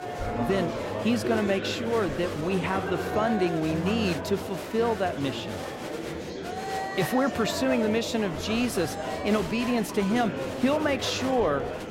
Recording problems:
murmuring crowd; loud; throughout; 5 dB below the speech

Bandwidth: 16 kHz